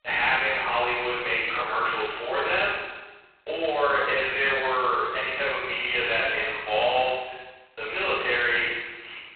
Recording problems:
phone-call audio; poor line; nothing above 4 kHz
room echo; strong; dies away in 1.3 s
off-mic speech; far

